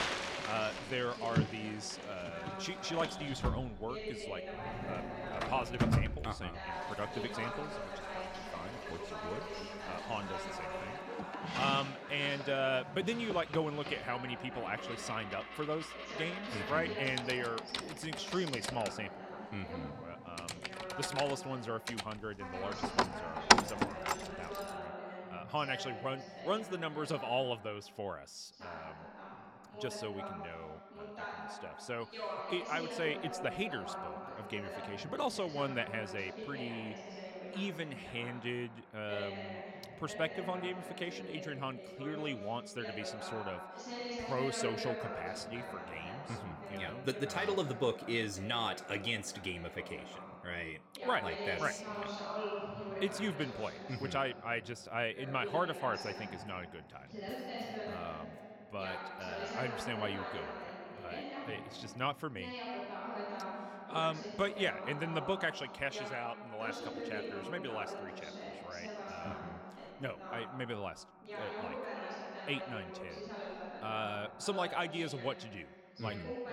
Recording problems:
household noises; very loud; until 25 s; 1 dB above the speech
voice in the background; loud; throughout; 5 dB below the speech

